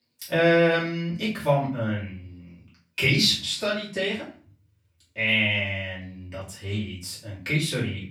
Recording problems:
off-mic speech; far
room echo; slight; dies away in 0.4 s

